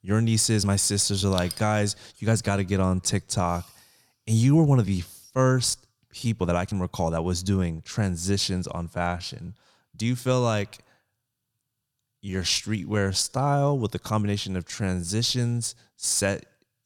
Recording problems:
uneven, jittery; strongly; from 0.5 to 16 s

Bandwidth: 18 kHz